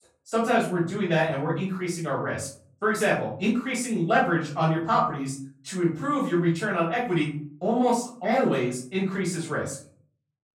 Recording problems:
off-mic speech; far
room echo; noticeable; dies away in 0.4 s

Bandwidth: 17 kHz